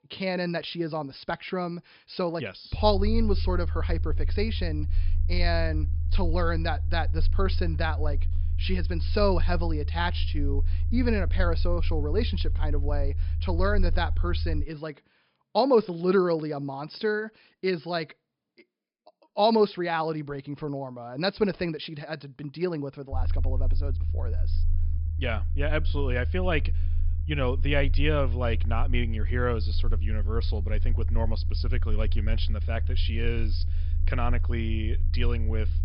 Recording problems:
high frequencies cut off; noticeable; nothing above 5.5 kHz
low rumble; noticeable; from 3 to 15 s and from 23 s on; 20 dB below the speech

